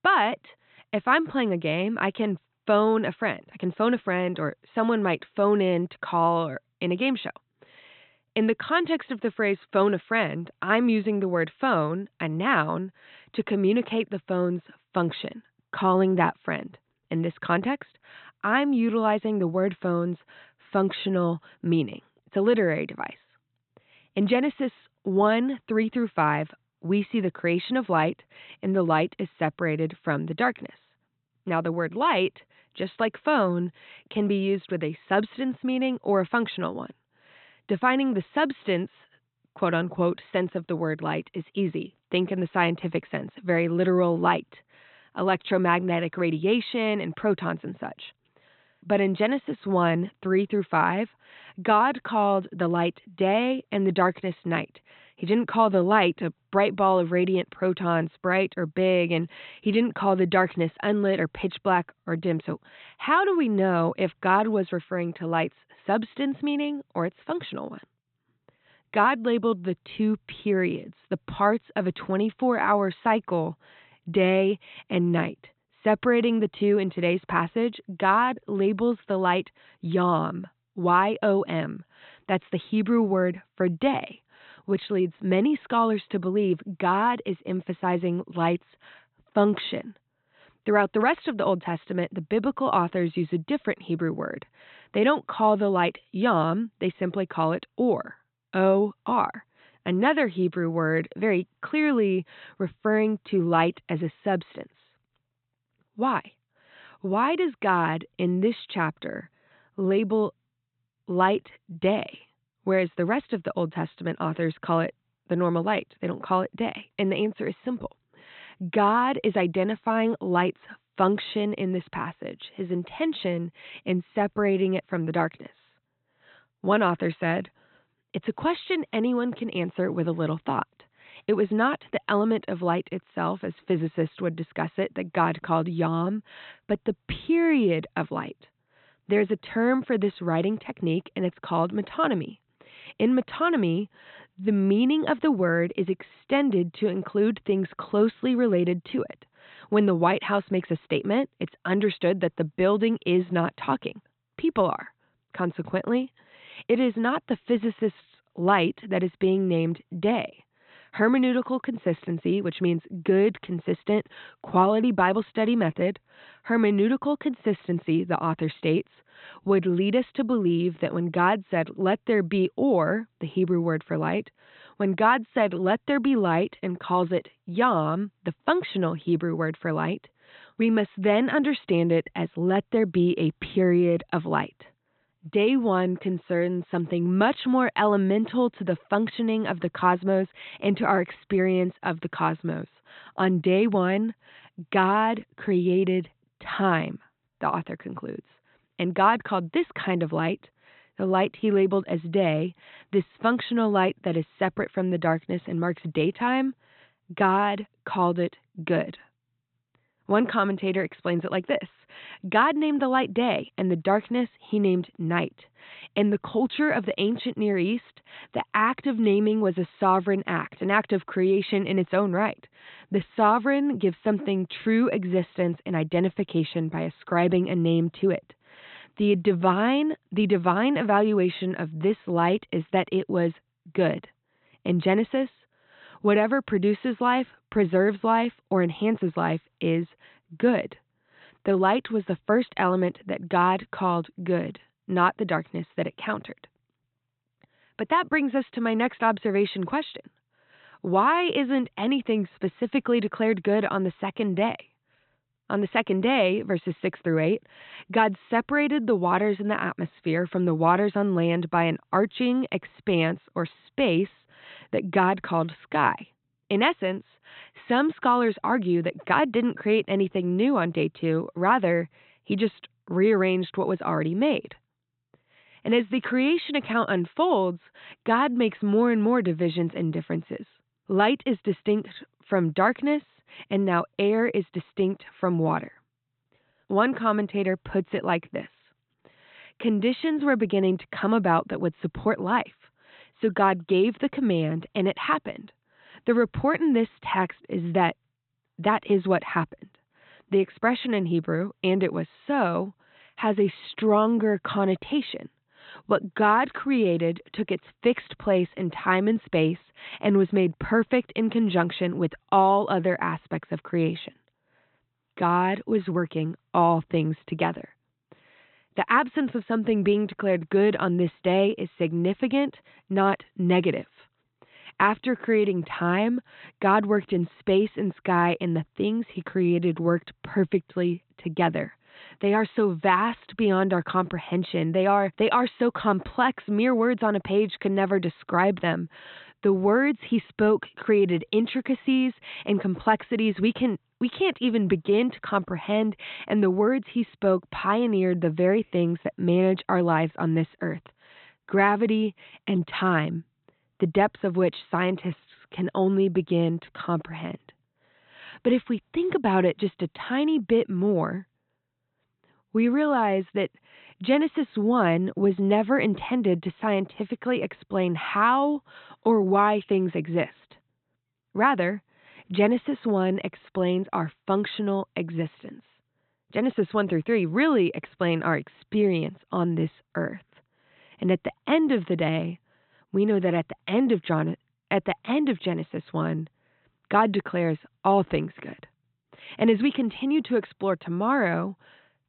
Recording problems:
high frequencies cut off; severe; nothing above 4 kHz

